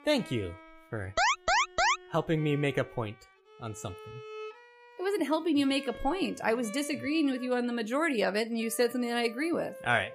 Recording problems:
background music; noticeable; throughout; 20 dB below the speech
alarm; loud; at 1 s; peak 5 dB above the speech

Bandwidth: 15 kHz